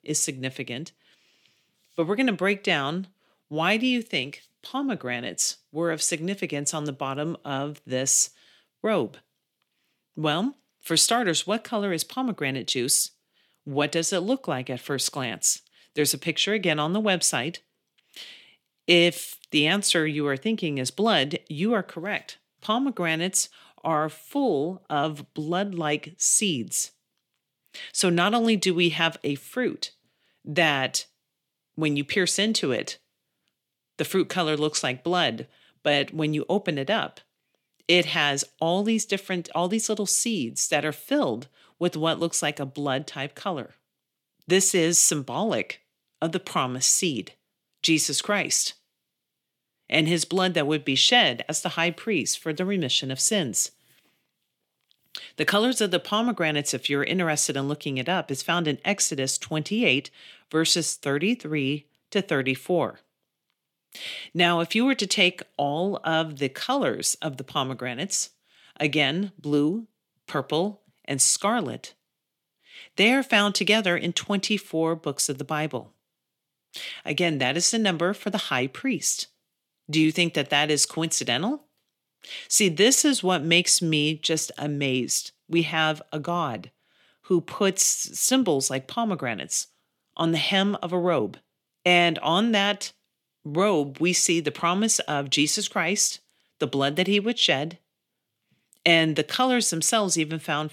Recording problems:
thin; somewhat; fading below 300 Hz

